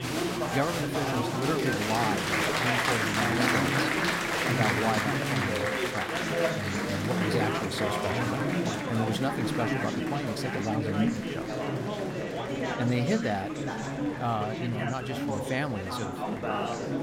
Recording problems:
chatter from many people; very loud; throughout; 4 dB above the speech

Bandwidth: 16 kHz